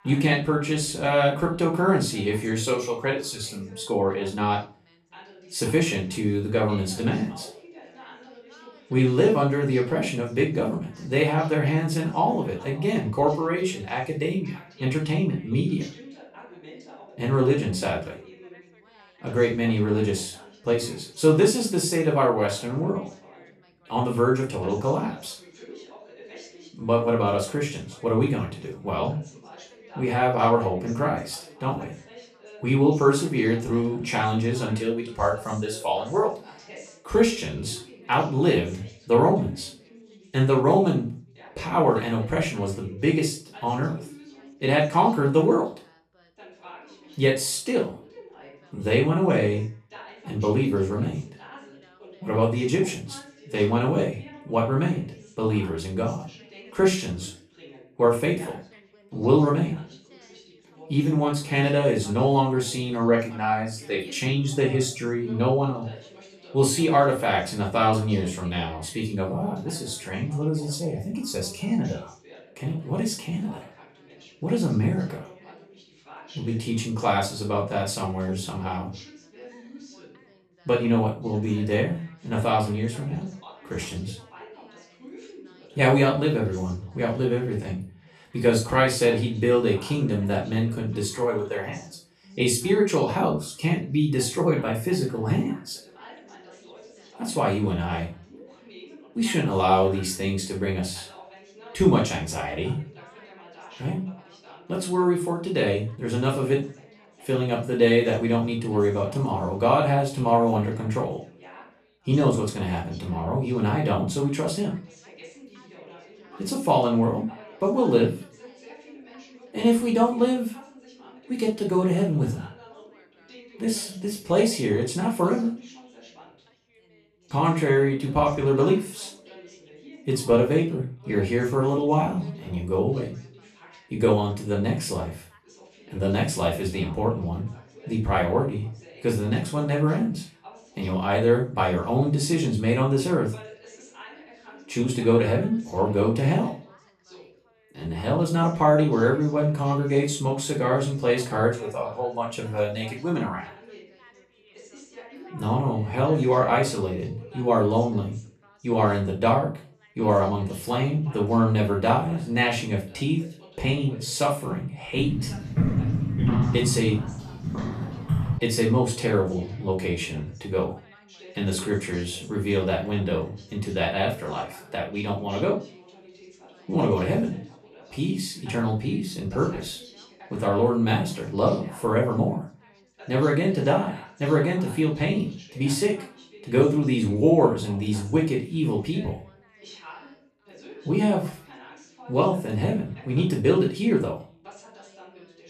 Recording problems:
off-mic speech; far
room echo; slight; dies away in 0.3 s
background chatter; faint; throughout; 3 voices, 25 dB below the speech
footsteps; loud; from 2:45 to 2:48; peak 2 dB above the speech

